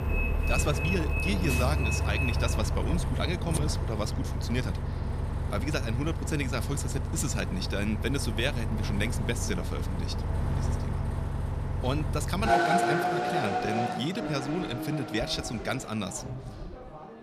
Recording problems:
traffic noise; very loud; throughout; 2 dB above the speech

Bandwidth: 14.5 kHz